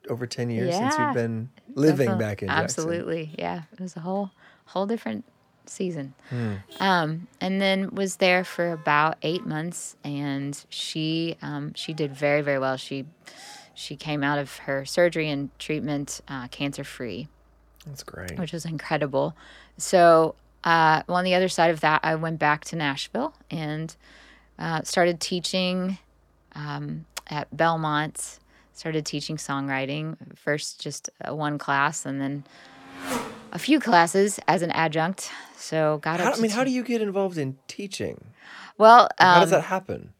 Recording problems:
traffic noise; noticeable; throughout; 20 dB below the speech

